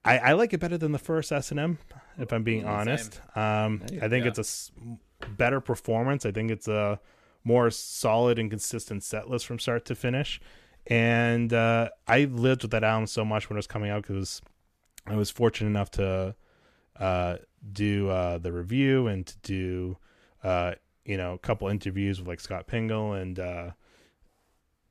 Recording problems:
none

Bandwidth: 14.5 kHz